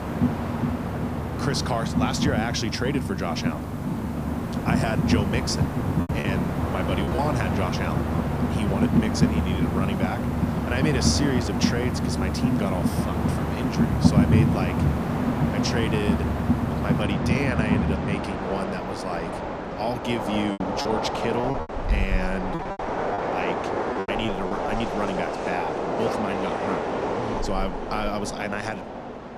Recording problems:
train or aircraft noise; very loud; throughout; 4 dB above the speech
hiss; noticeable; until 17 s; 20 dB below the speech
choppy; very; at 6 s and from 21 to 25 s; 9% of the speech affected

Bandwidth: 15 kHz